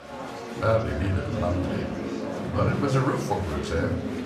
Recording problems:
room echo; slight; dies away in 0.4 s
off-mic speech; somewhat distant
murmuring crowd; loud; throughout; 5 dB below the speech
background music; faint; throughout; 25 dB below the speech

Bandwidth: 13.5 kHz